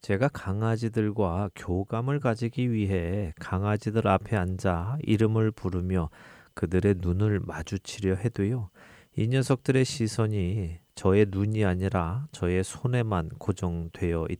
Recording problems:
none

